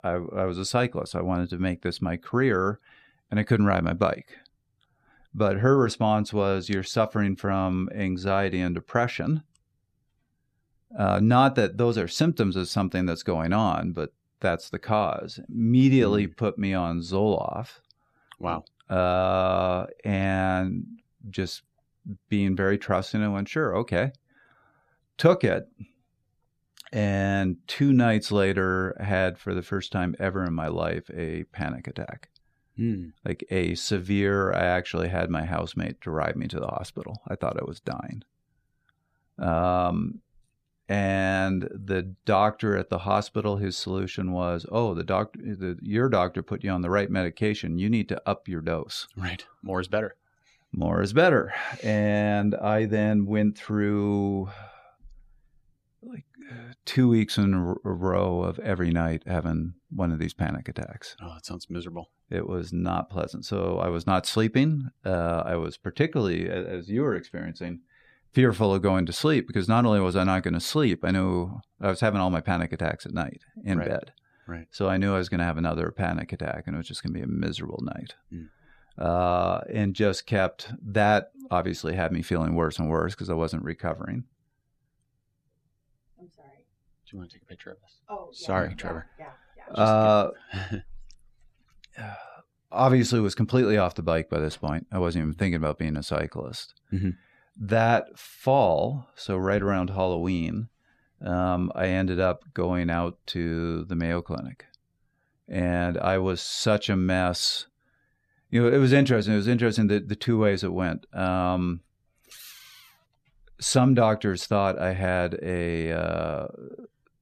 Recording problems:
none

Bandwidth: 14.5 kHz